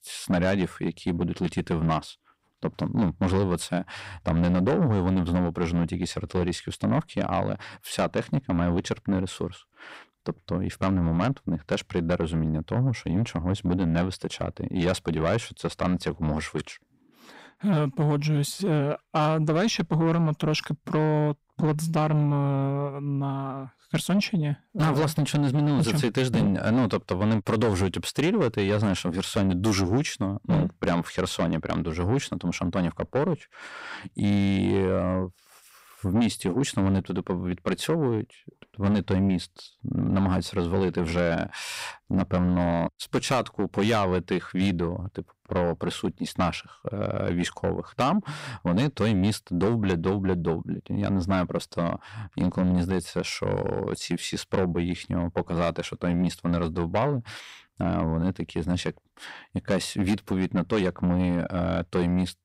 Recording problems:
distortion; slight; 10 dB below the speech

